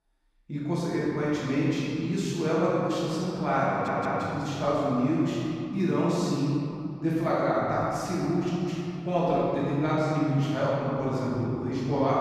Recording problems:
room echo; strong; dies away in 3 s
off-mic speech; far
audio stuttering; at 3.5 s

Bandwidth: 14.5 kHz